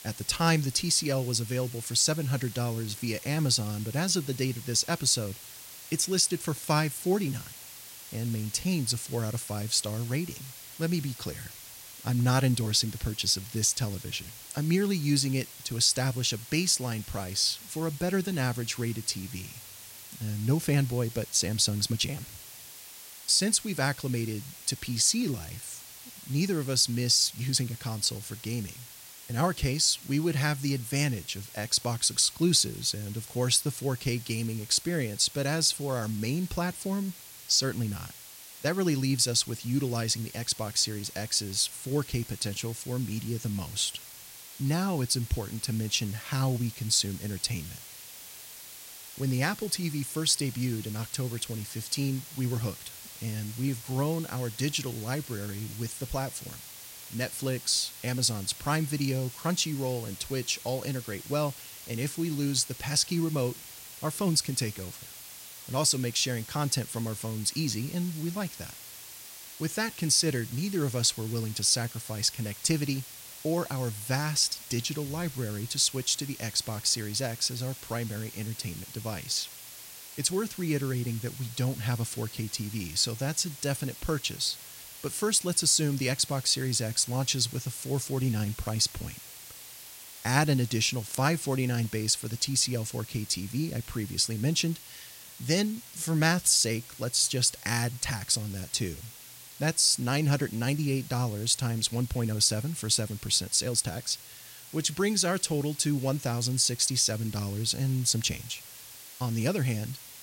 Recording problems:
hiss; noticeable; throughout; 15 dB below the speech

